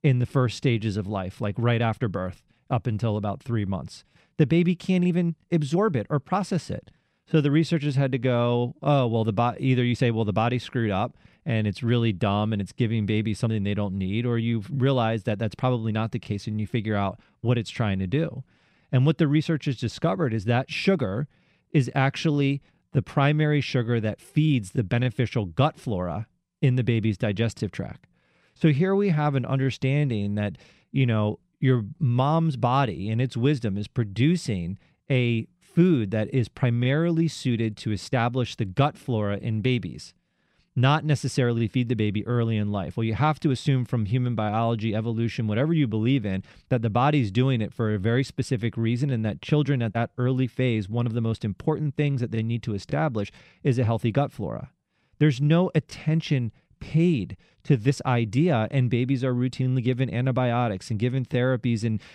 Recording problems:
none

